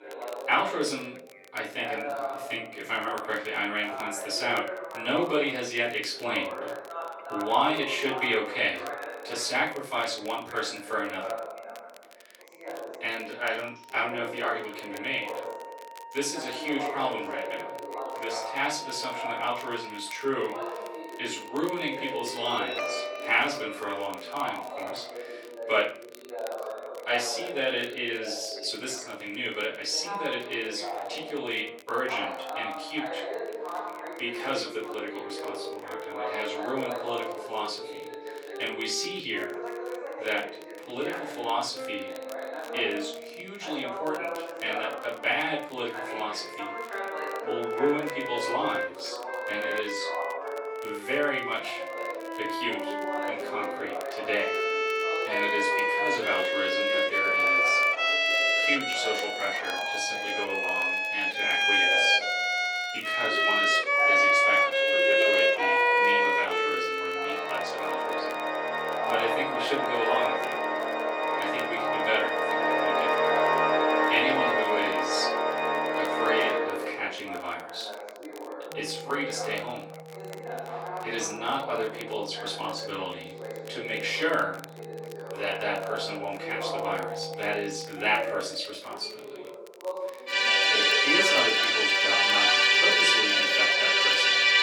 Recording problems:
off-mic speech; far
room echo; noticeable; dies away in 0.3 s
thin; somewhat; fading below 350 Hz
background music; very loud; throughout; 7 dB above the speech
background chatter; loud; throughout; 2 voices, 7 dB below the speech
crackle, like an old record; faint; 20 dB below the speech

